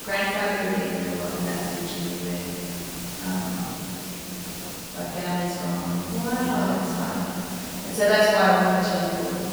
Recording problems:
room echo; strong; dies away in 3 s
off-mic speech; far
hiss; loud; throughout; 9 dB below the speech
voice in the background; faint; throughout; 20 dB below the speech

